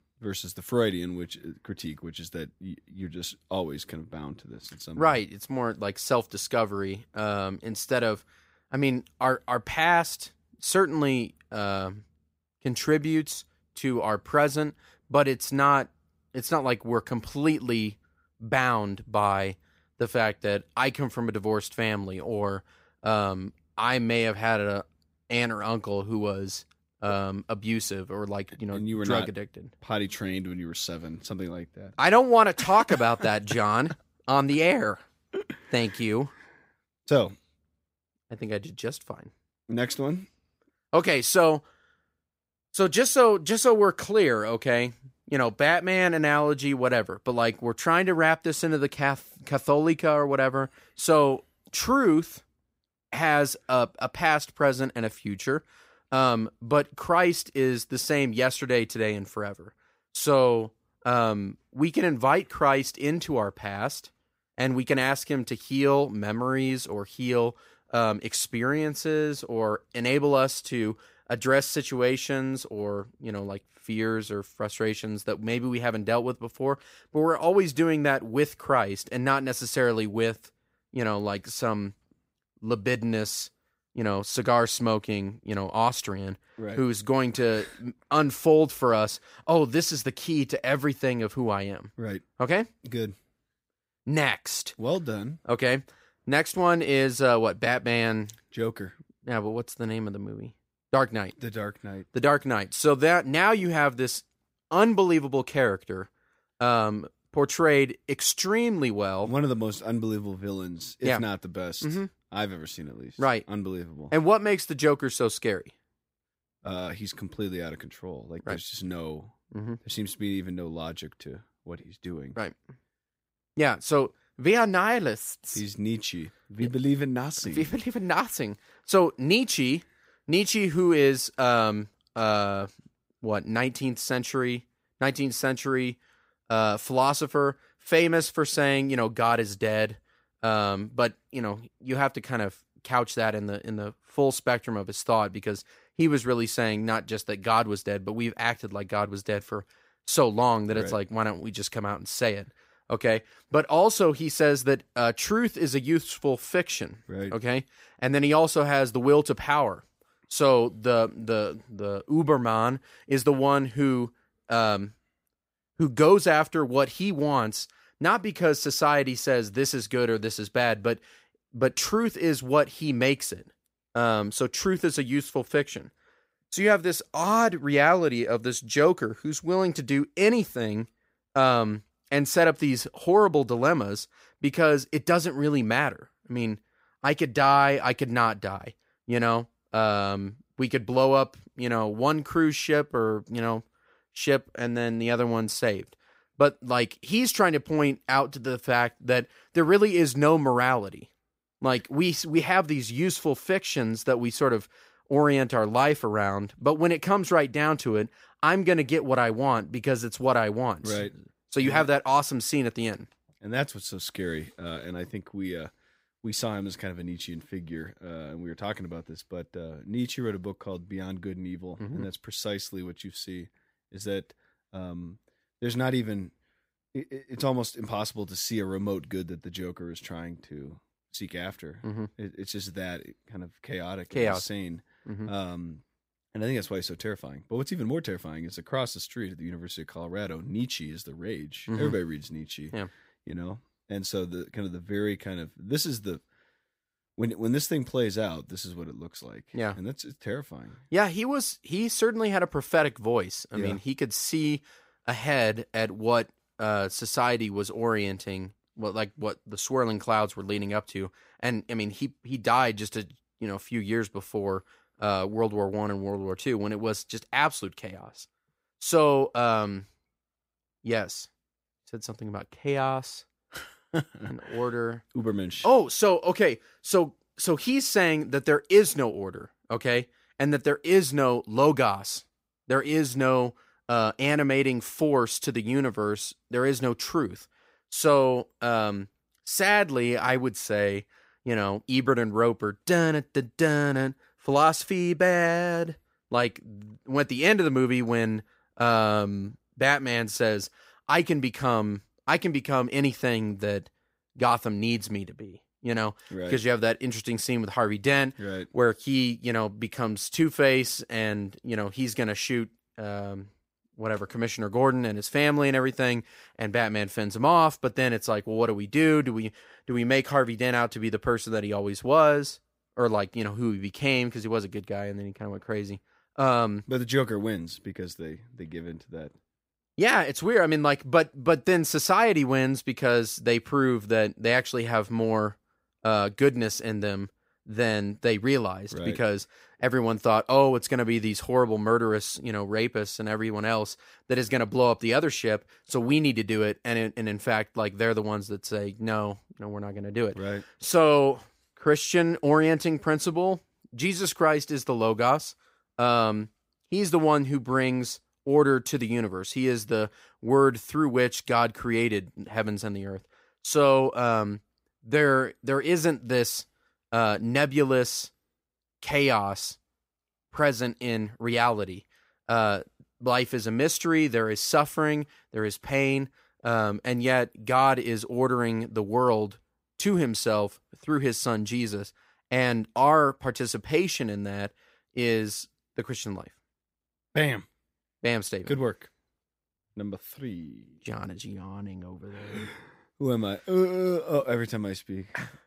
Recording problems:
none

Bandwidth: 15.5 kHz